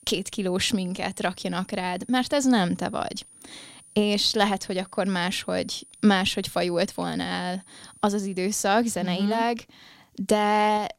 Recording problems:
high-pitched whine; faint; until 8.5 s; 9.5 kHz, 25 dB below the speech

